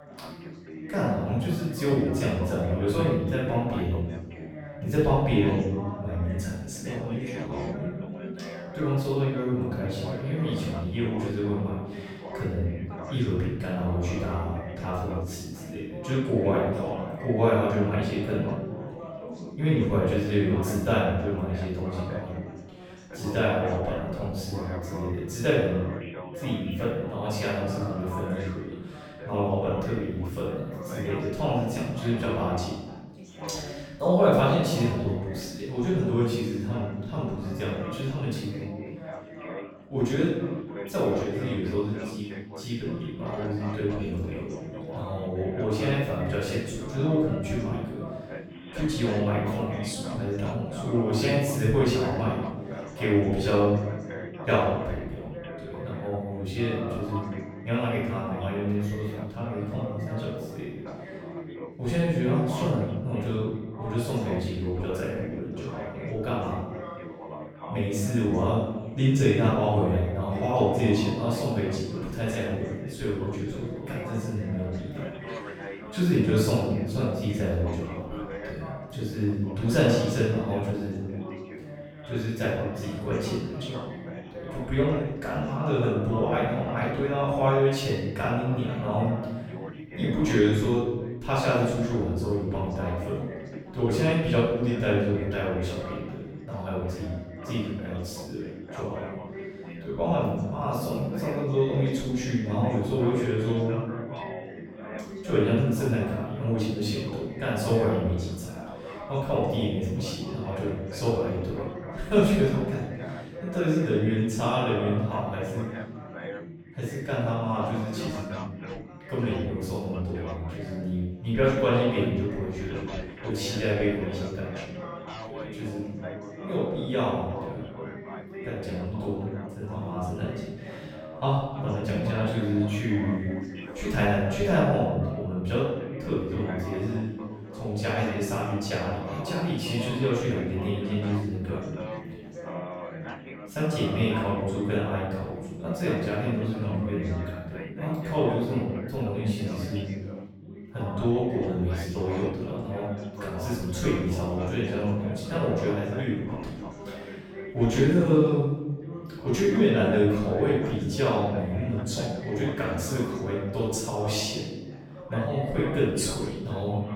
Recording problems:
room echo; strong; dies away in 1 s
off-mic speech; far
background chatter; noticeable; throughout; 3 voices, 10 dB below the speech

